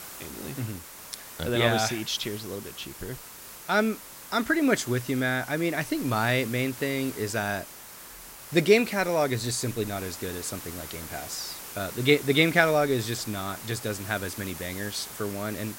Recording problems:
hiss; noticeable; throughout; 15 dB below the speech

